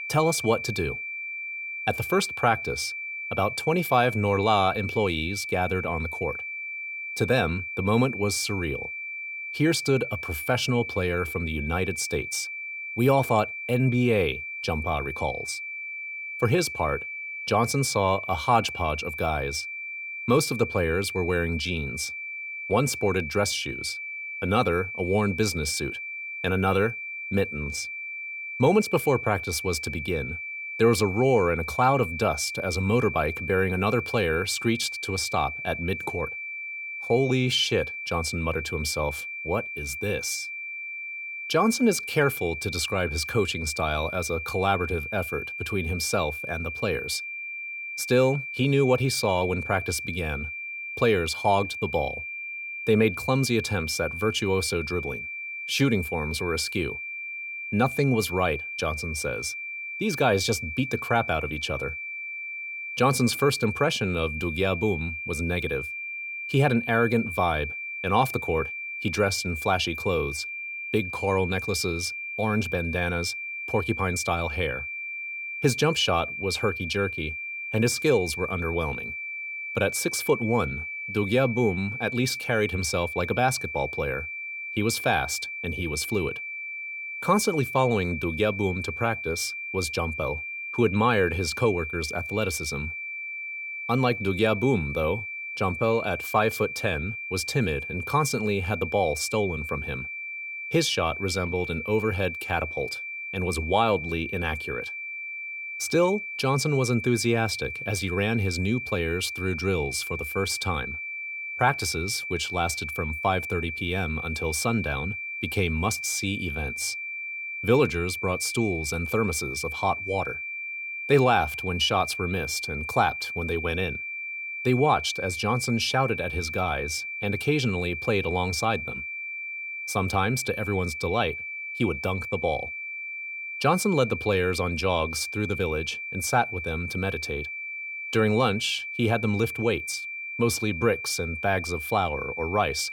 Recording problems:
high-pitched whine; loud; throughout; 2.5 kHz, 6 dB below the speech

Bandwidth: 17.5 kHz